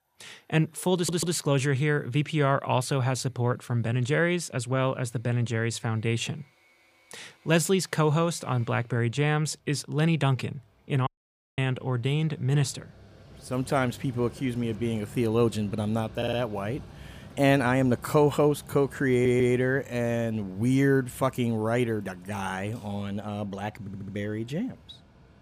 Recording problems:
machinery noise; faint; throughout; 20 dB below the speech
audio stuttering; 4 times, first at 1 s
audio cutting out; at 11 s for 0.5 s

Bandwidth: 15 kHz